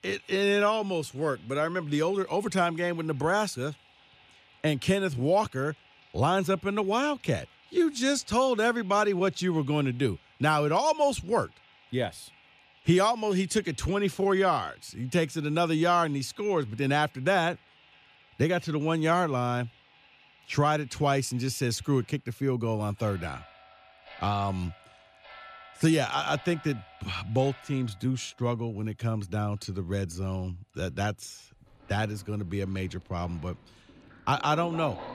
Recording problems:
household noises; faint; throughout; 25 dB below the speech

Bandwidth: 14.5 kHz